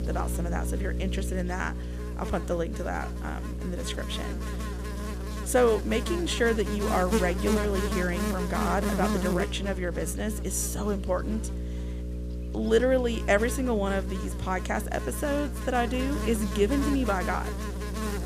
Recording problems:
electrical hum; loud; throughout; 60 Hz, 8 dB below the speech

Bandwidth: 15 kHz